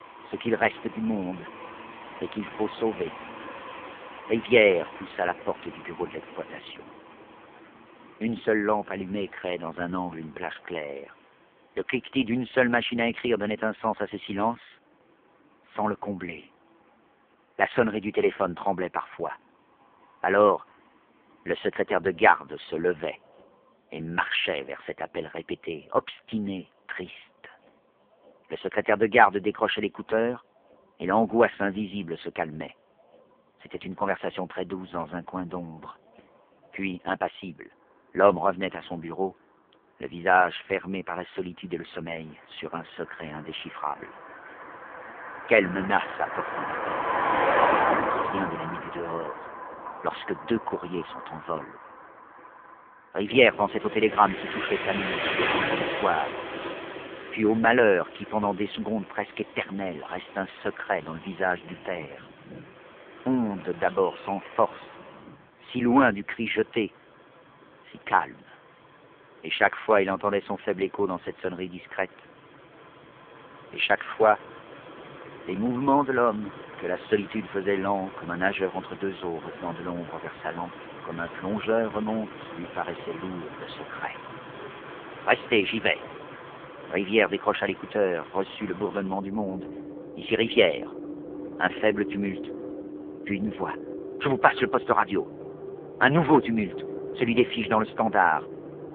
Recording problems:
phone-call audio; poor line
traffic noise; loud; throughout; 8 dB below the speech

